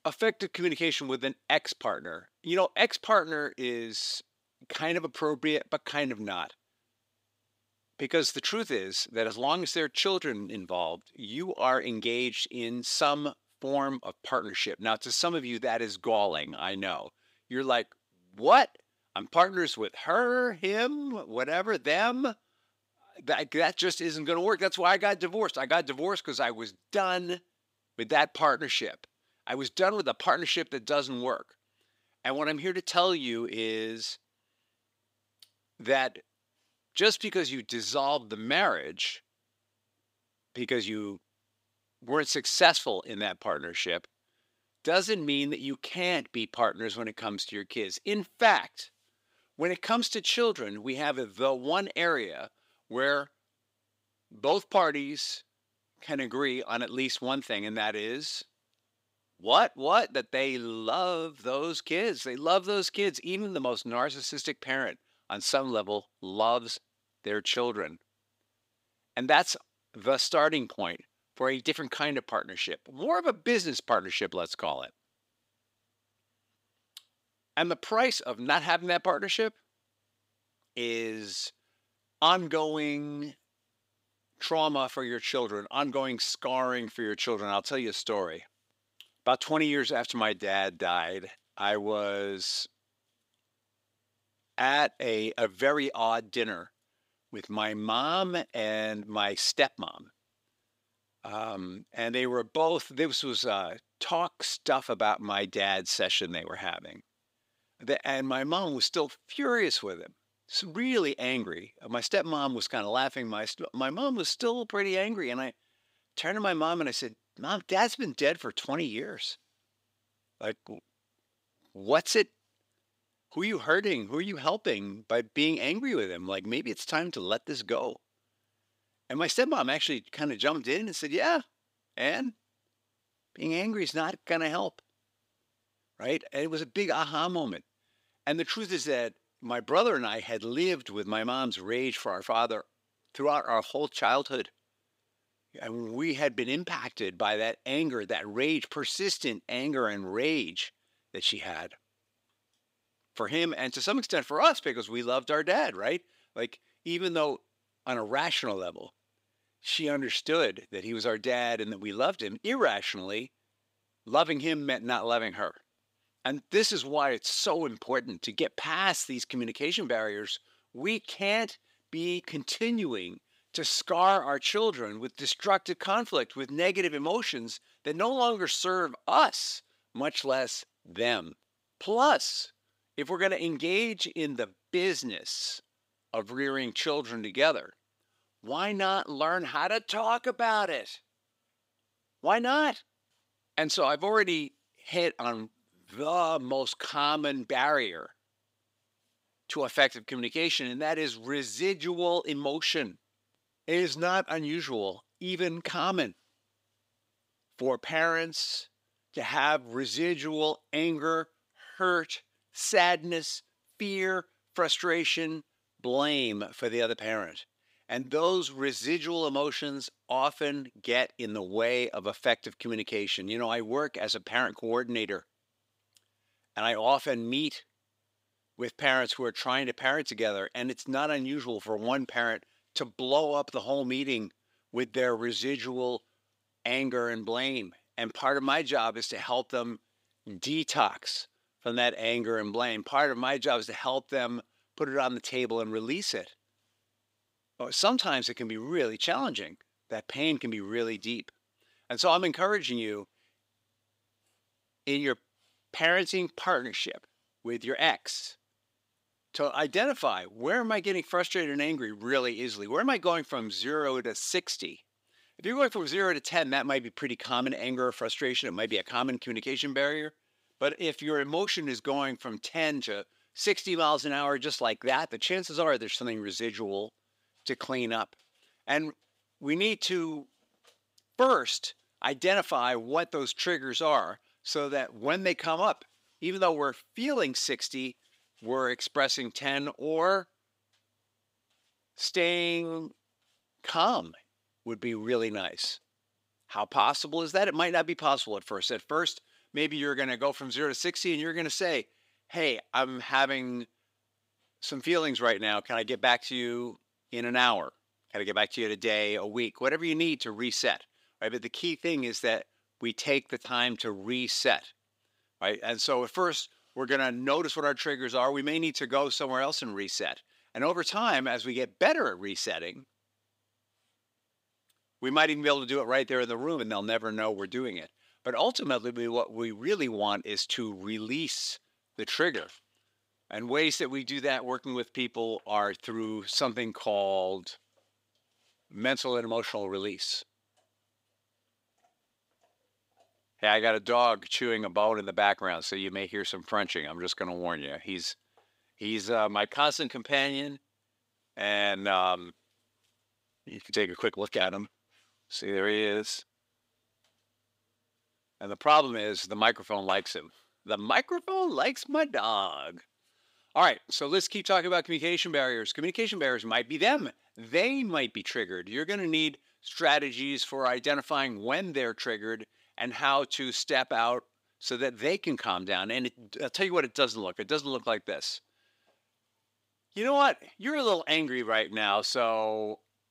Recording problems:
thin; somewhat; fading below 350 Hz

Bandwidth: 15.5 kHz